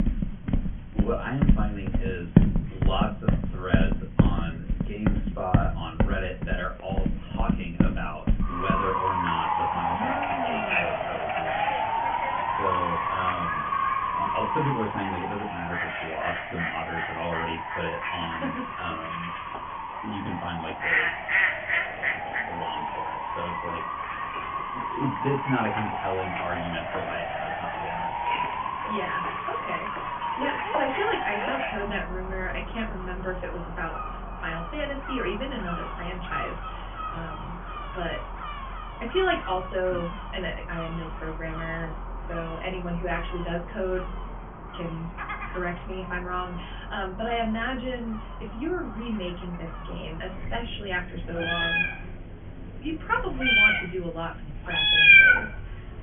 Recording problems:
off-mic speech; far
high frequencies cut off; severe; nothing above 3.5 kHz
room echo; very slight; dies away in 0.2 s
animal sounds; very loud; throughout; 6 dB above the speech

